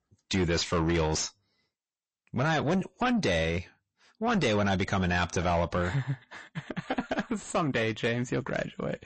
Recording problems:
distortion; heavy; 7 dB below the speech
garbled, watery; slightly; nothing above 8 kHz

